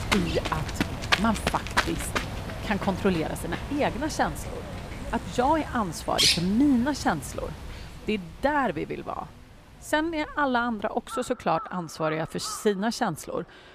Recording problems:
animal sounds; loud; throughout; 3 dB below the speech

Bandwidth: 15 kHz